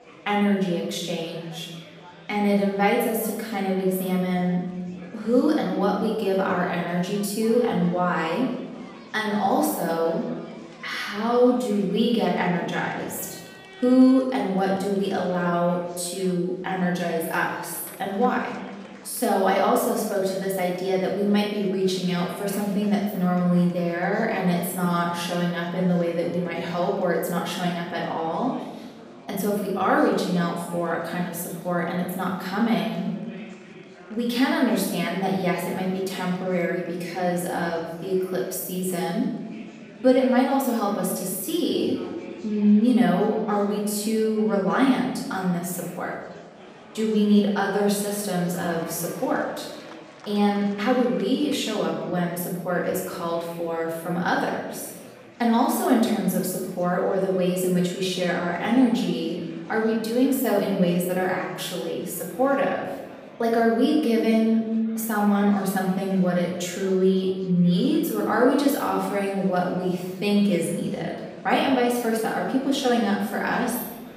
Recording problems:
off-mic speech; far
room echo; noticeable; dies away in 1.1 s
chatter from many people; faint; throughout; 20 dB below the speech

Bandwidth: 15 kHz